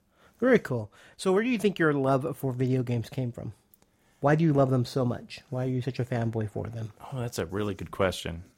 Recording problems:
none

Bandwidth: 16 kHz